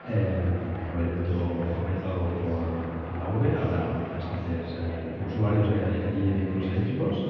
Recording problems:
off-mic speech; far
muffled; very; fading above 3 kHz
room echo; noticeable; dies away in 1.7 s
chatter from many people; noticeable; throughout; 10 dB below the speech
background music; very faint; from 4.5 s on; 25 dB below the speech

